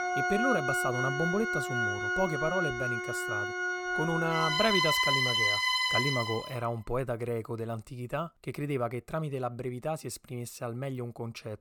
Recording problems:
background music; very loud; until 6 s; 5 dB above the speech

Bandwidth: 18 kHz